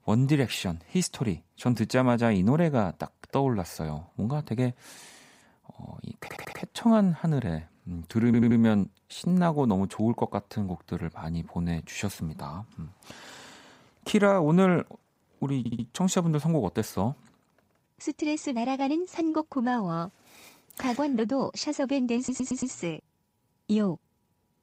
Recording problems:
audio stuttering; 4 times, first at 6 s

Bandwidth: 15.5 kHz